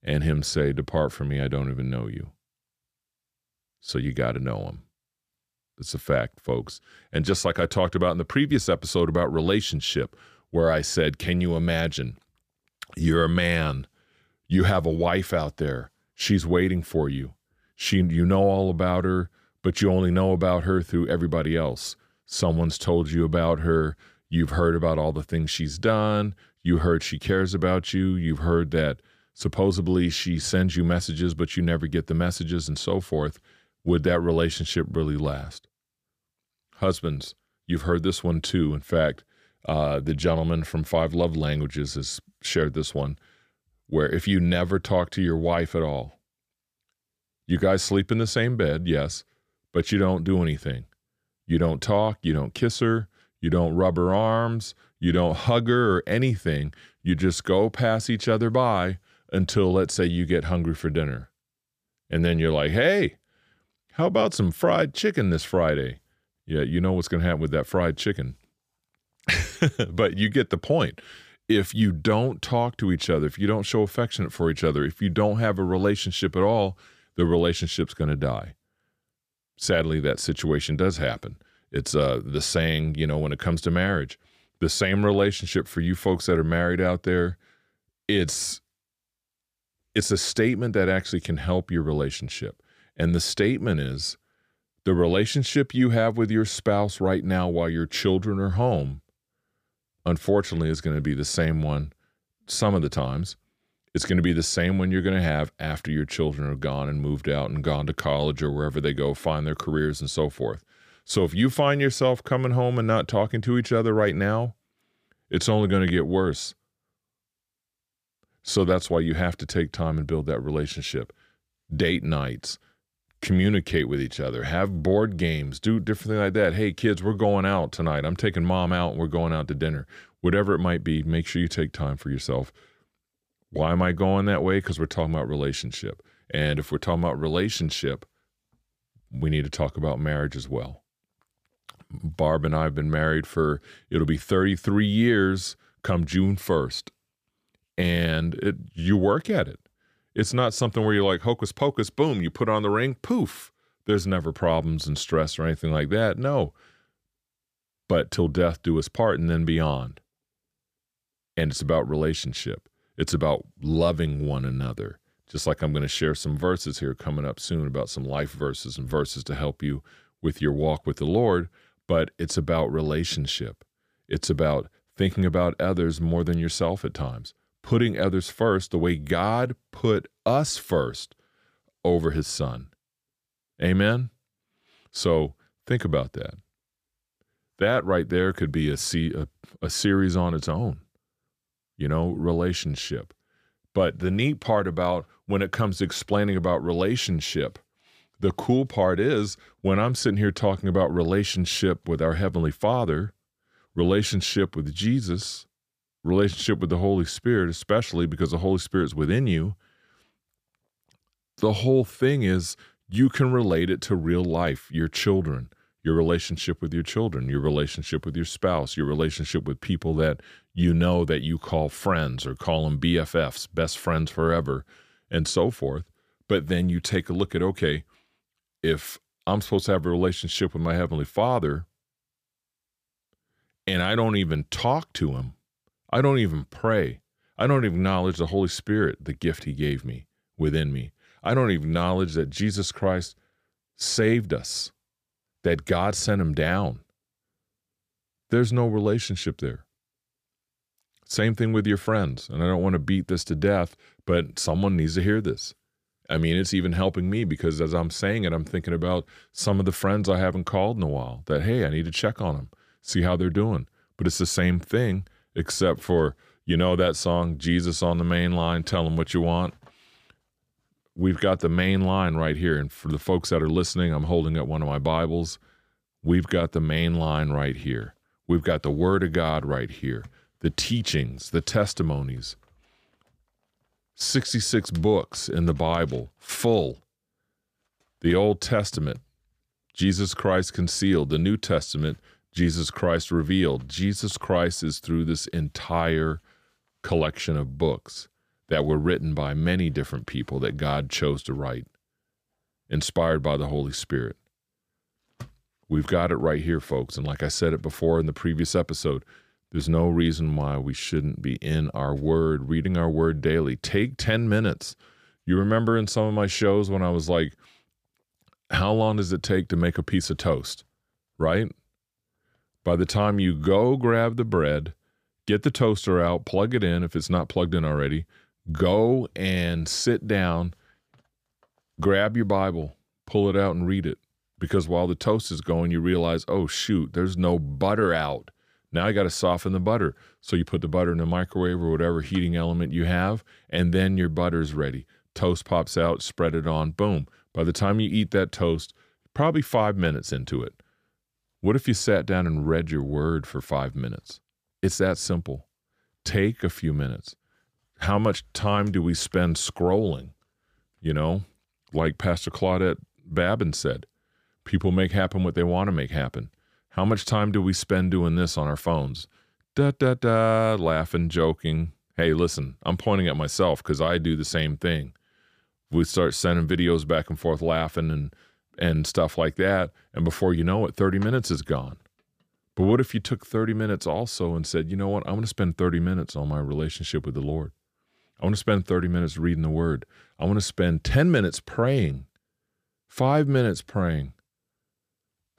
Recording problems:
none

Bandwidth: 15 kHz